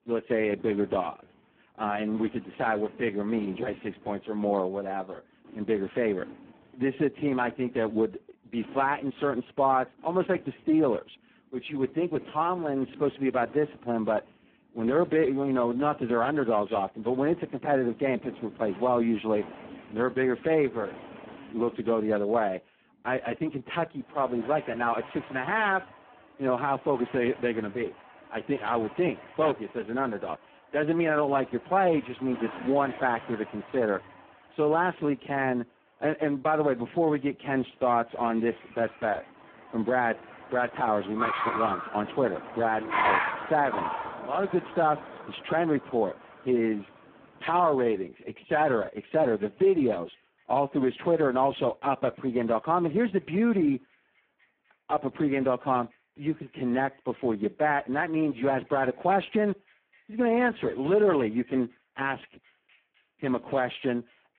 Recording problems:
phone-call audio; poor line
traffic noise; noticeable; throughout; 10 dB below the speech

